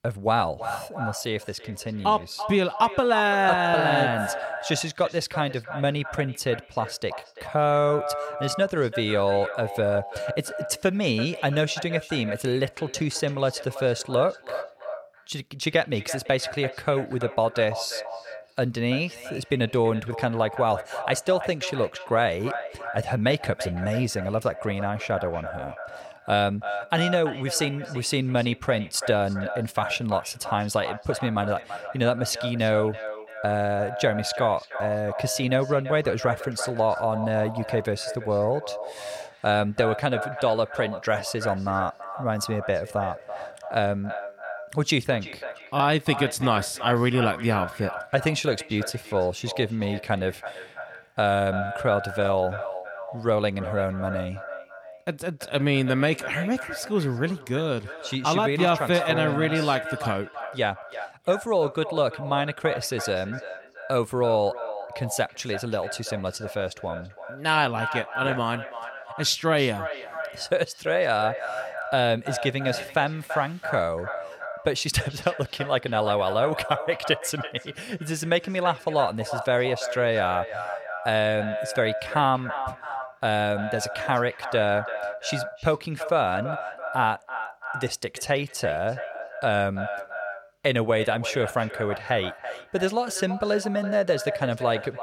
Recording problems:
echo of what is said; strong; throughout; 330 ms later, 9 dB below the speech

